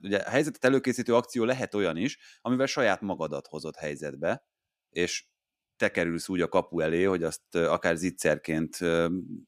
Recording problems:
none

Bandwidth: 14.5 kHz